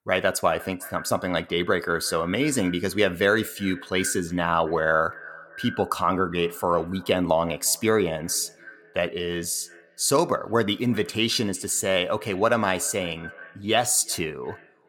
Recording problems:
echo of what is said; faint; throughout; 360 ms later, 20 dB below the speech

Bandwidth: 18 kHz